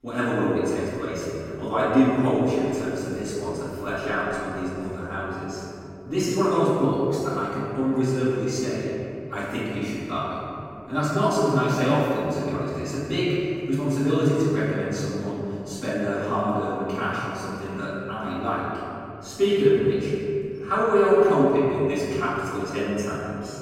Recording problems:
room echo; strong; dies away in 2.8 s
off-mic speech; far

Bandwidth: 16 kHz